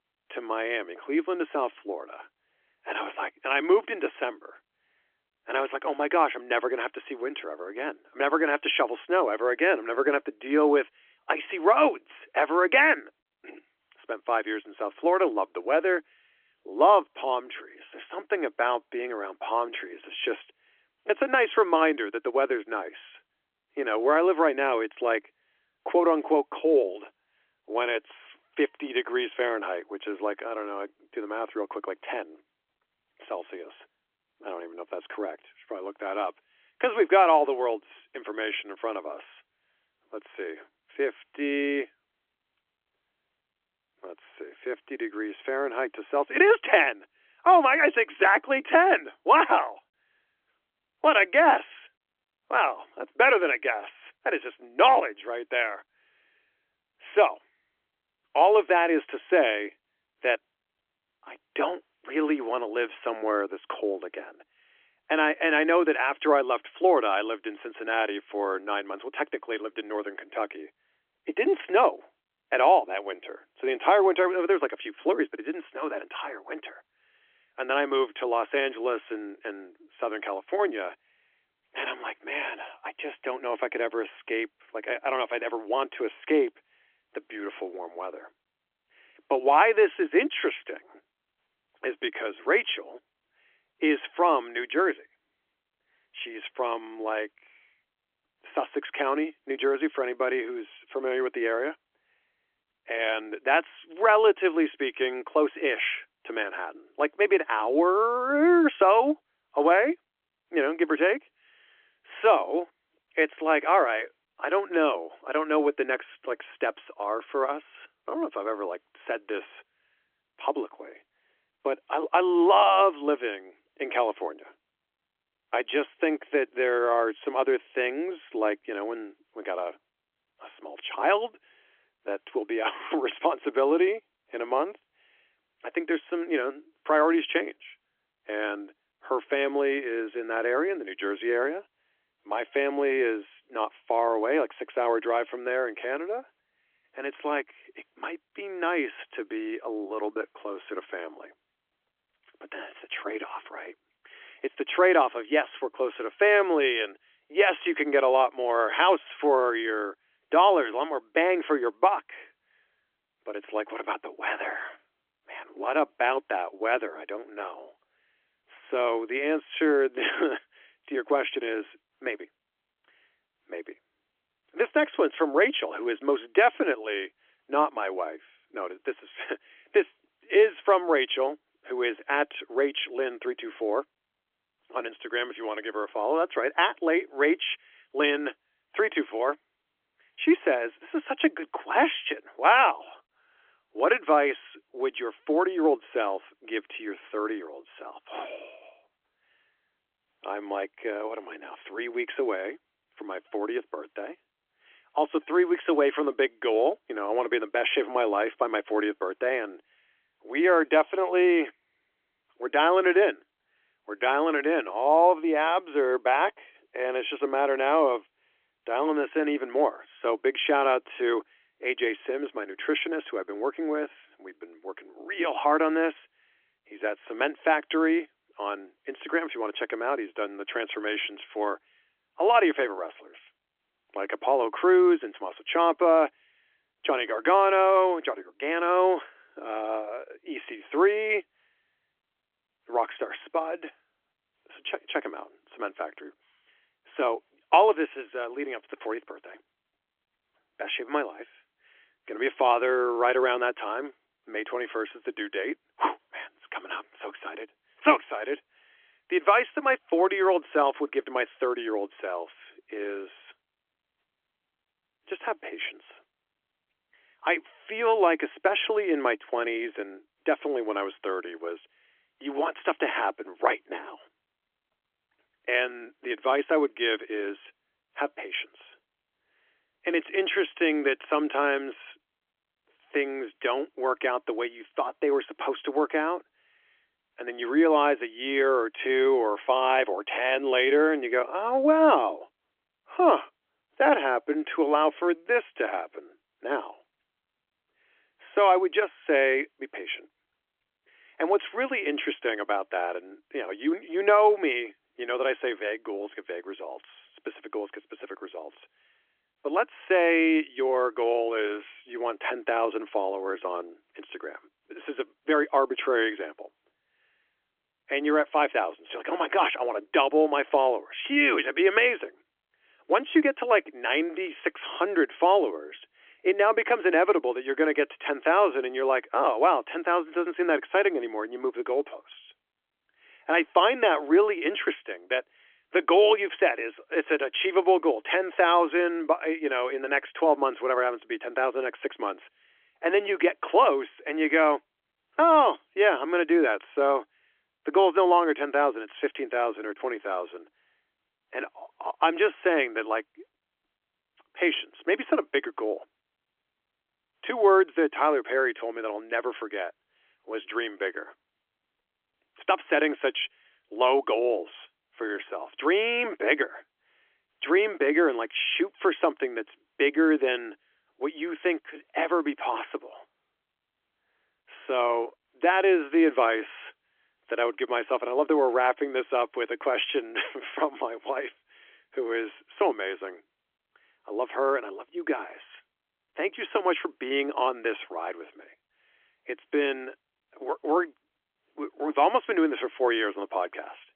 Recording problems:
phone-call audio; nothing above 3.5 kHz

